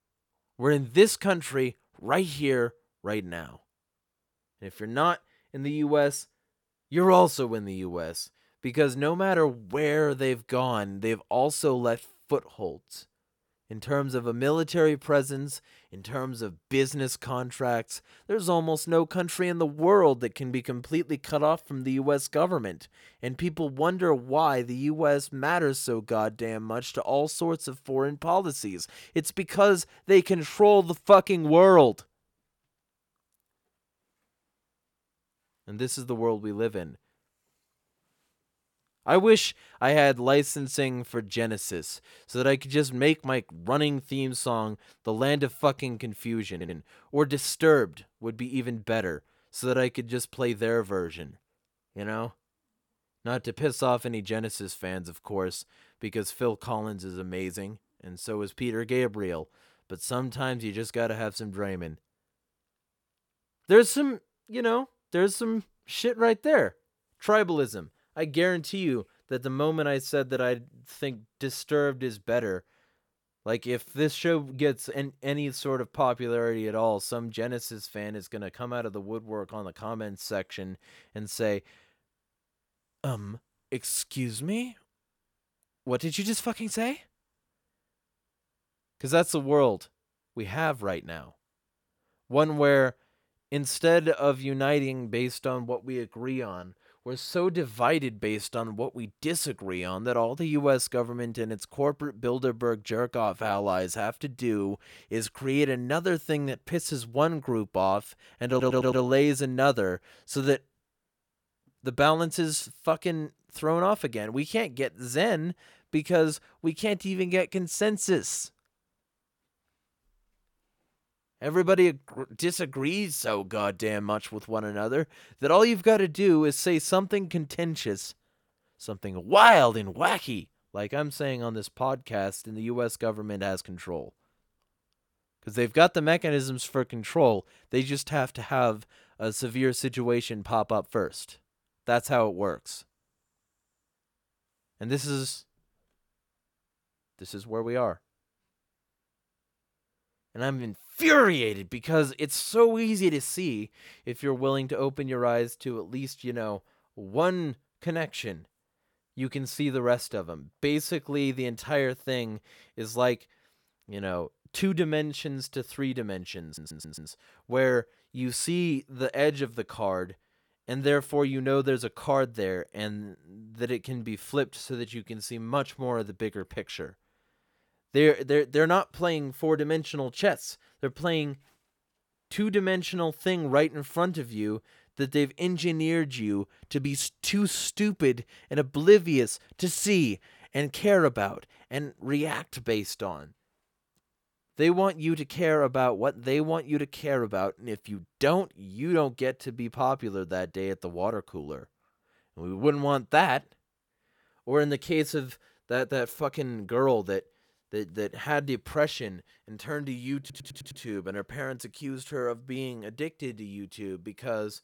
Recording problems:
audio stuttering; 4 times, first at 47 s

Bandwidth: 18 kHz